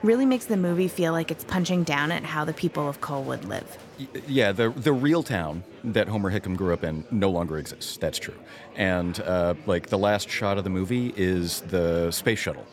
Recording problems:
murmuring crowd; noticeable; throughout; 20 dB below the speech

